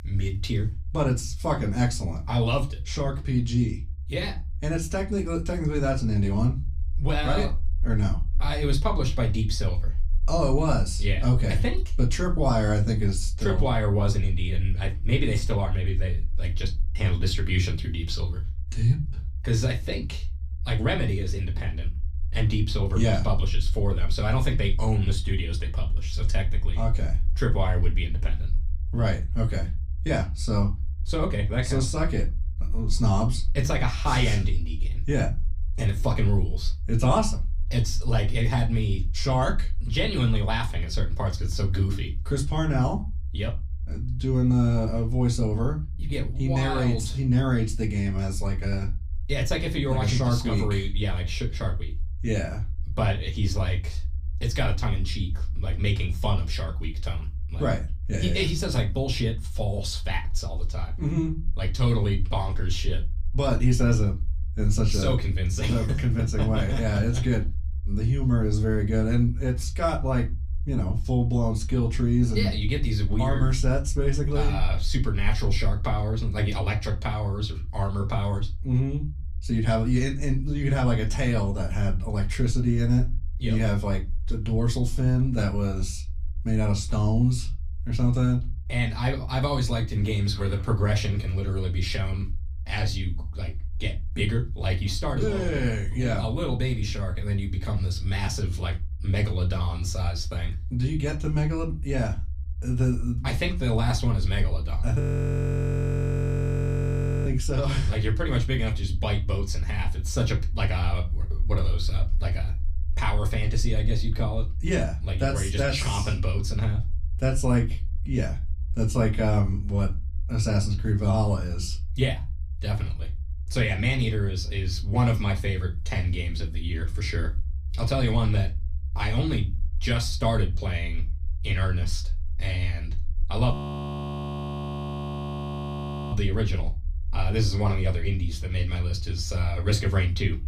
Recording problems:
off-mic speech; far
room echo; very slight; dies away in 0.3 s
low rumble; faint; throughout; 20 dB below the speech
audio freezing; at 1:45 for 2.5 s and at 2:14 for 2.5 s

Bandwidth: 15 kHz